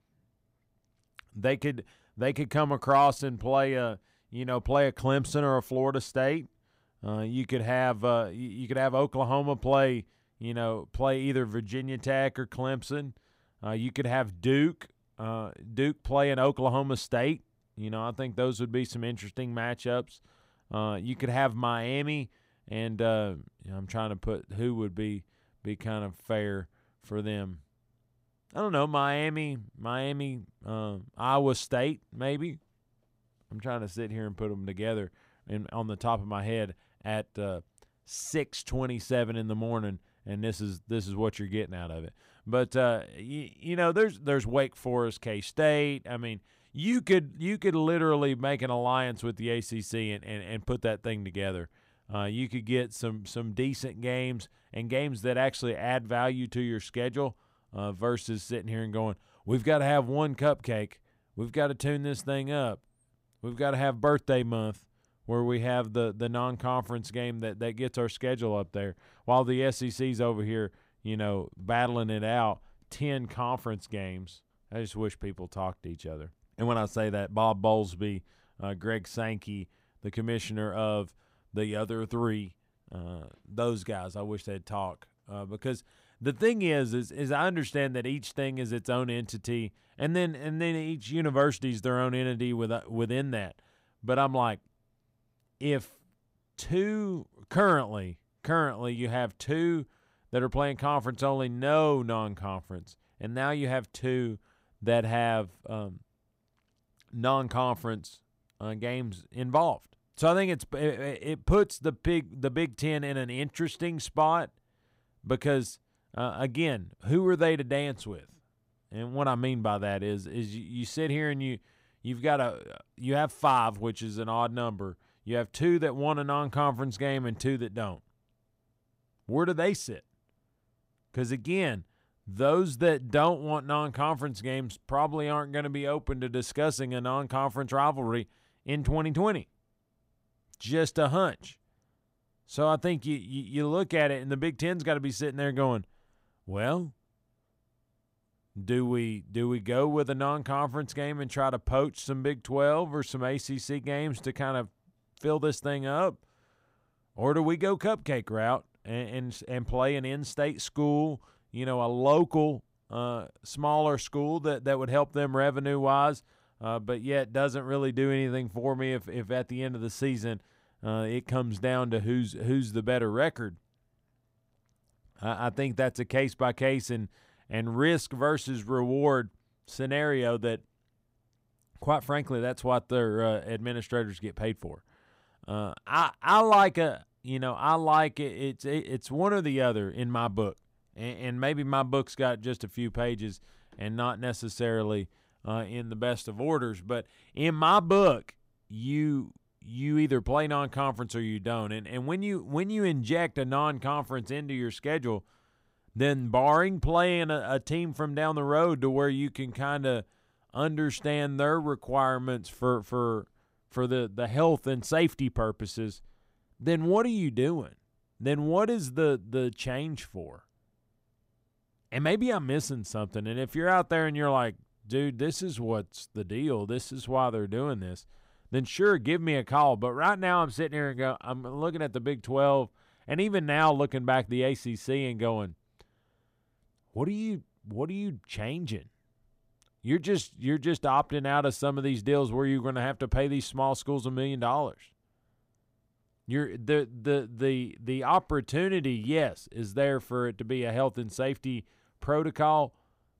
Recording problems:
none

